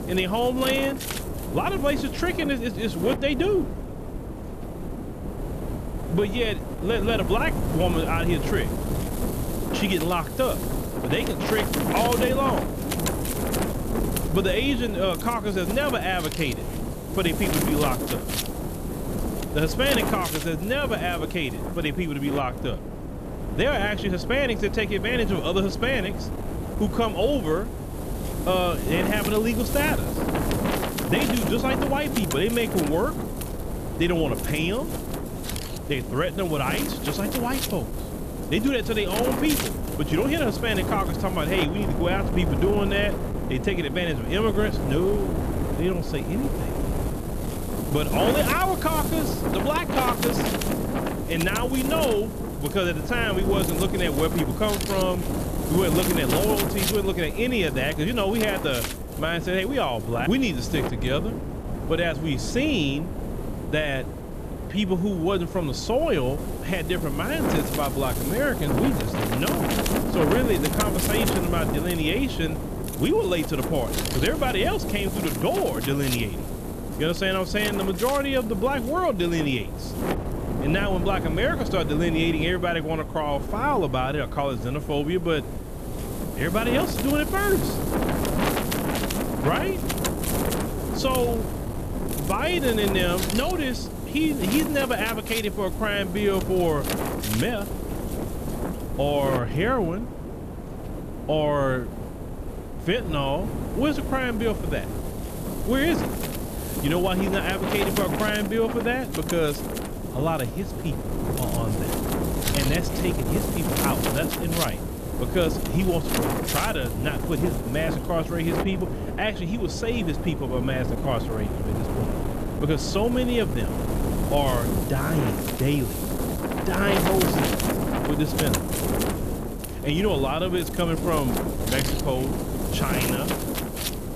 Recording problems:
wind noise on the microphone; heavy; 5 dB below the speech

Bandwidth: 14.5 kHz